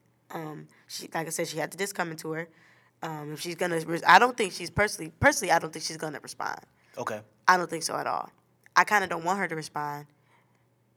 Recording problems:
none

